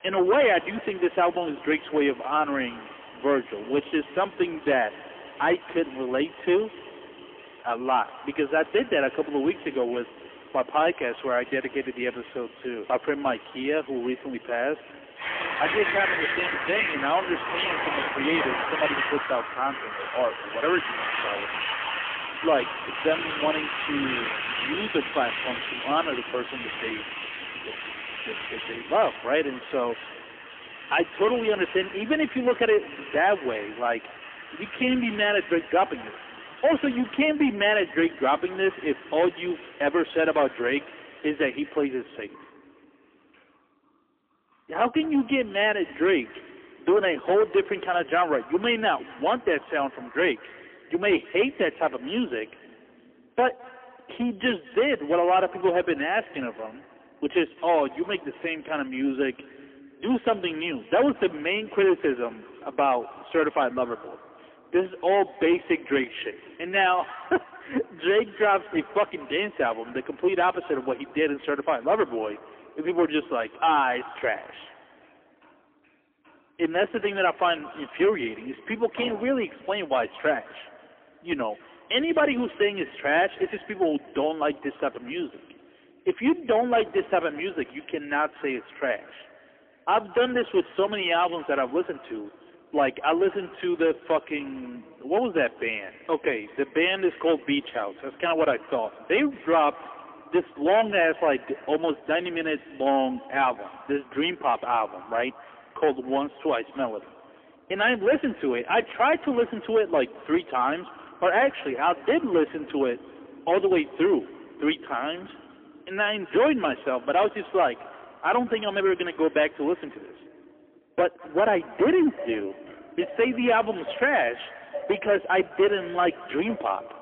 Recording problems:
phone-call audio; poor line; nothing above 3.5 kHz
echo of what is said; faint; throughout; 210 ms later, 20 dB below the speech
distortion; slight; 6% of the sound clipped
traffic noise; loud; throughout; 8 dB below the speech

